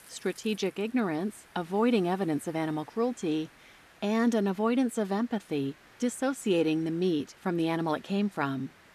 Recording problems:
hiss; faint; throughout; 25 dB below the speech

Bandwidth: 14.5 kHz